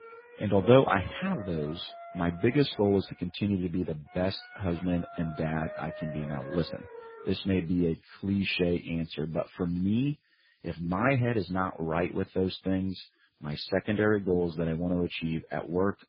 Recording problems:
garbled, watery; badly; nothing above 5 kHz
background music; noticeable; throughout; 15 dB below the speech

